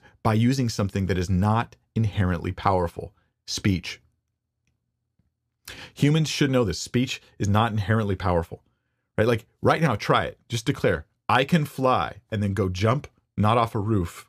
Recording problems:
none

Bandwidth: 14.5 kHz